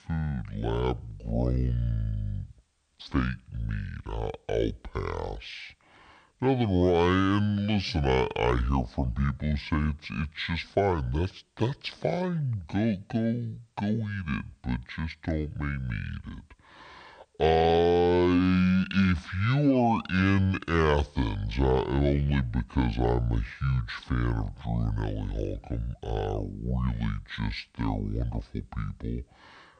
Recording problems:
wrong speed and pitch; too slow and too low; 0.6 times normal speed

